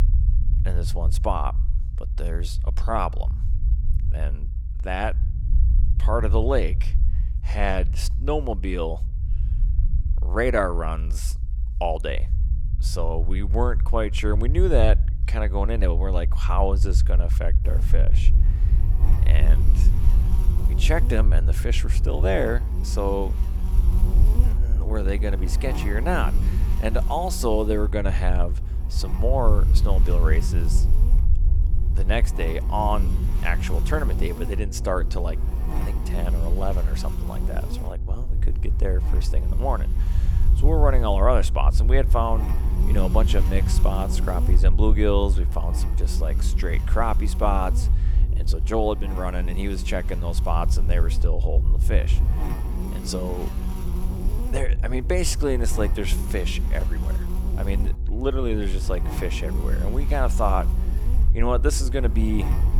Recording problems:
electrical hum; noticeable; from 18 s on; 60 Hz, 15 dB below the speech
low rumble; noticeable; throughout; 15 dB below the speech

